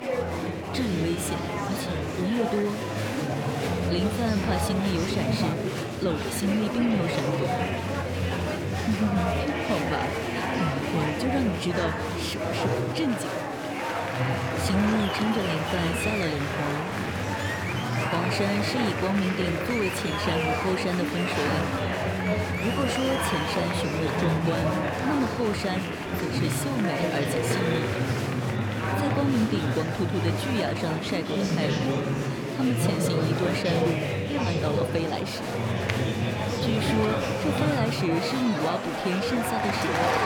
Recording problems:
murmuring crowd; very loud; throughout; 2 dB above the speech
crowd noise; very faint; throughout; 25 dB below the speech

